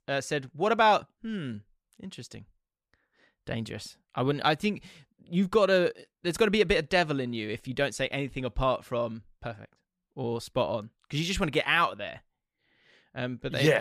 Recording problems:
abrupt cut into speech; at the end

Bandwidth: 14.5 kHz